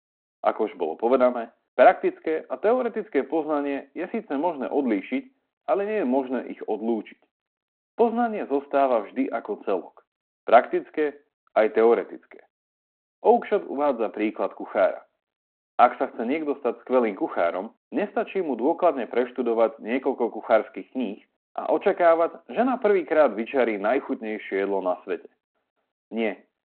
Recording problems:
phone-call audio; nothing above 4 kHz

